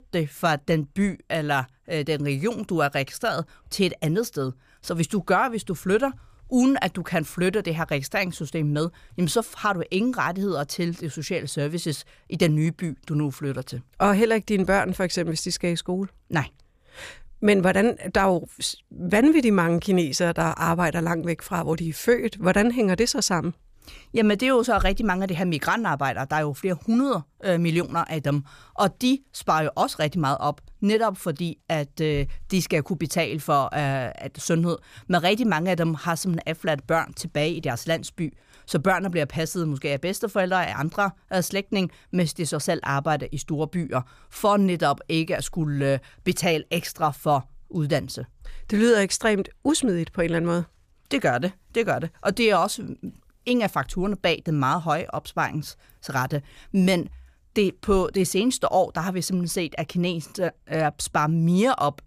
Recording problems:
none

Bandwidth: 15 kHz